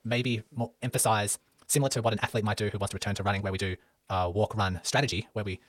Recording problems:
wrong speed, natural pitch; too fast; 1.8 times normal speed

